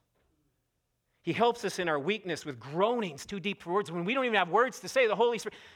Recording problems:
none

